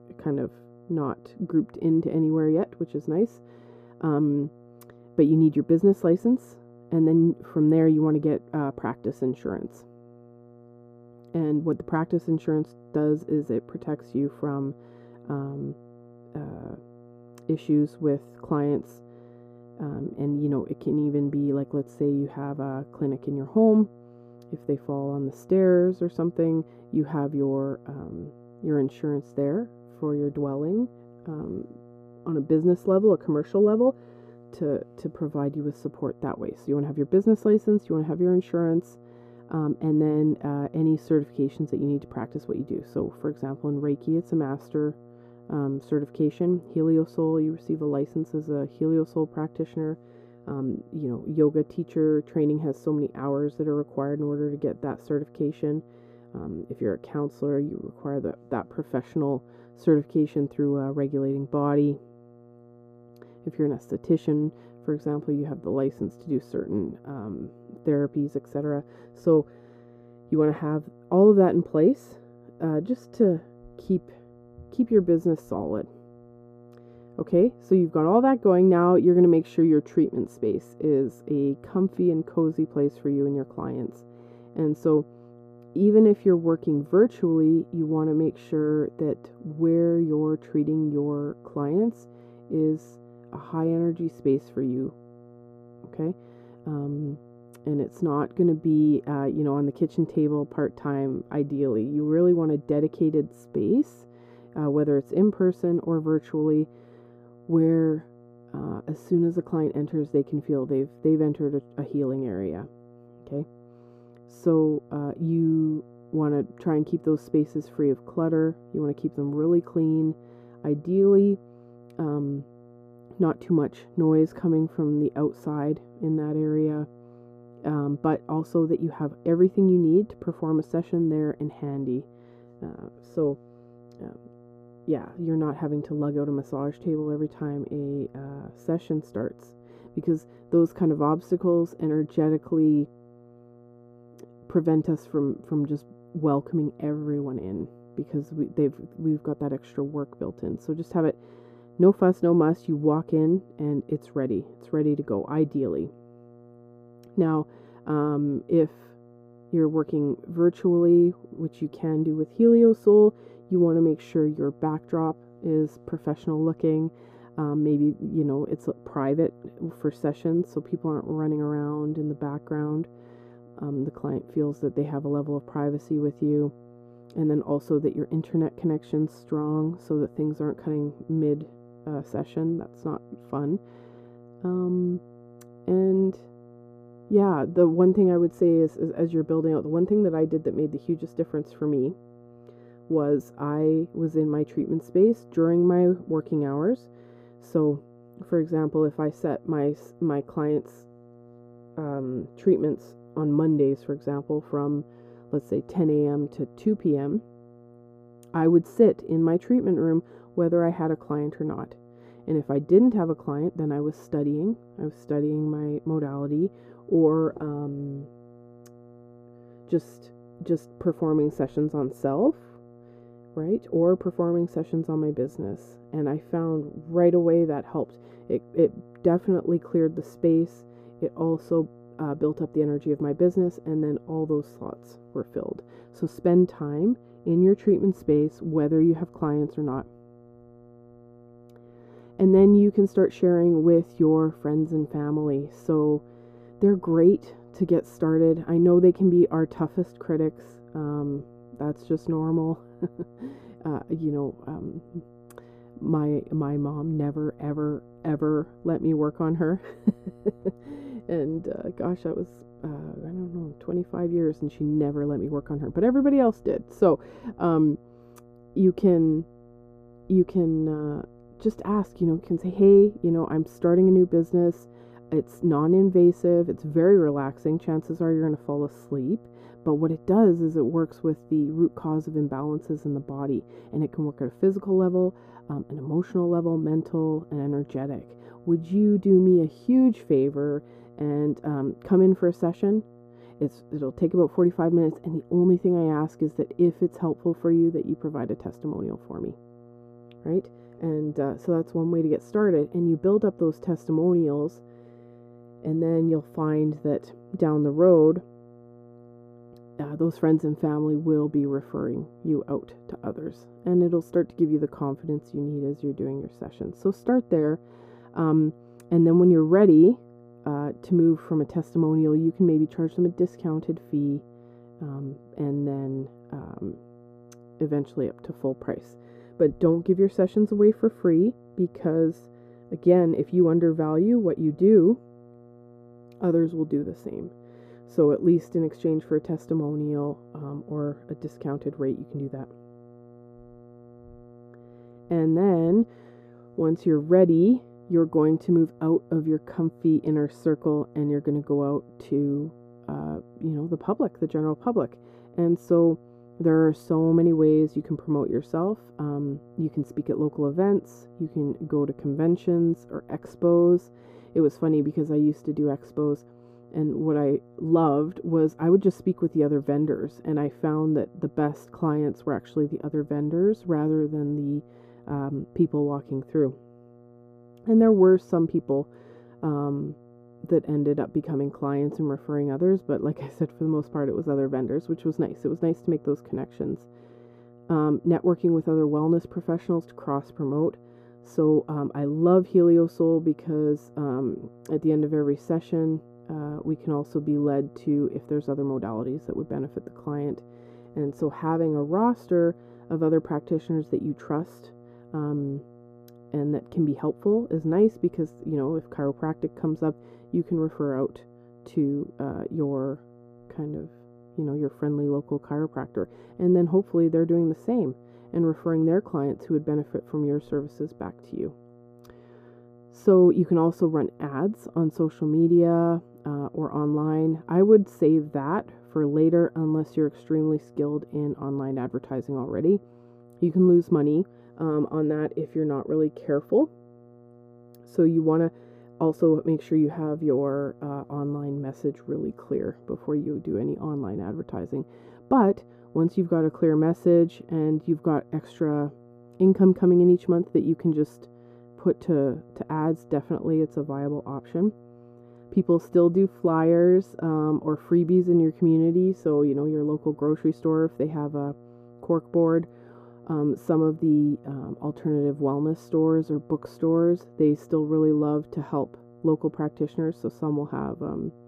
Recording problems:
muffled; very; fading above 1 kHz
electrical hum; faint; throughout; 60 Hz, 25 dB below the speech

